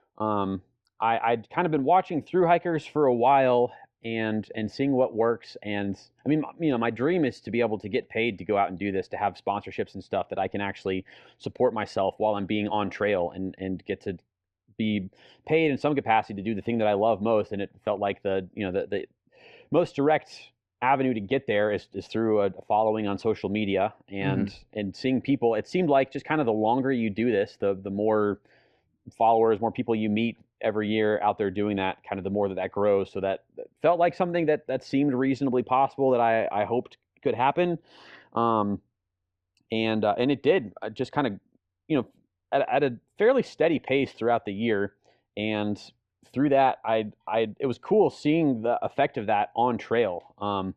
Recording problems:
muffled; slightly; fading above 2.5 kHz

